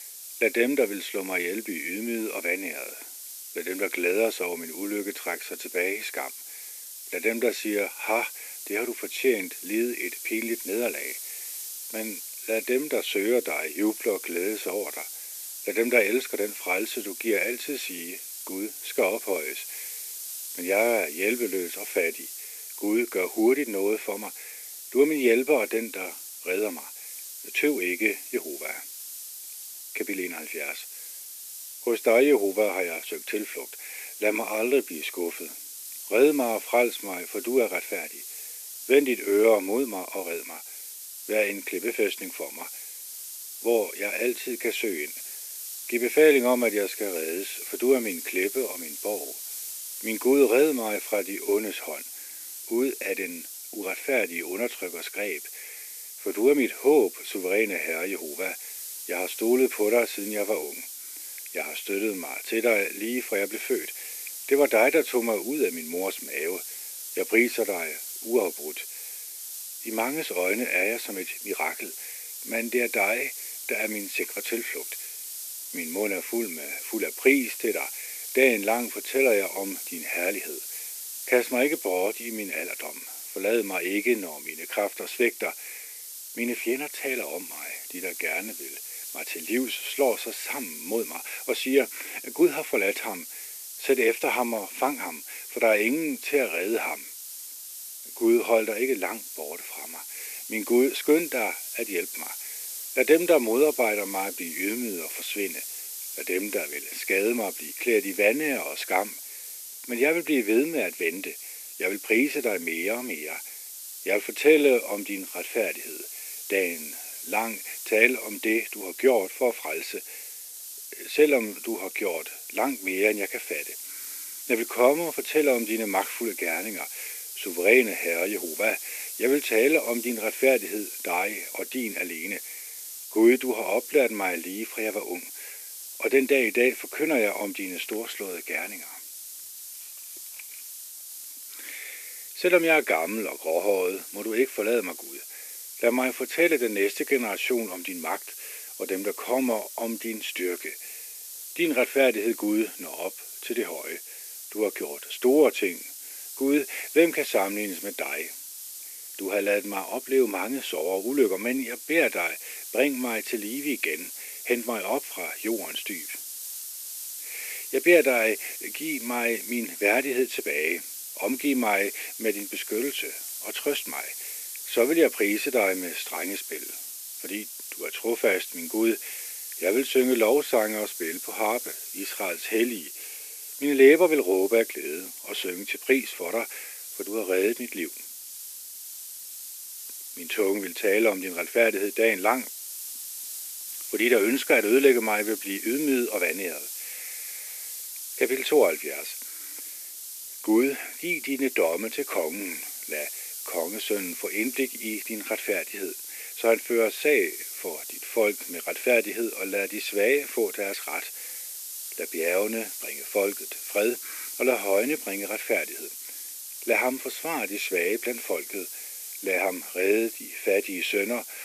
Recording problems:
thin; somewhat; fading below 300 Hz
hiss; loud; throughout; 9 dB below the speech

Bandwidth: 14.5 kHz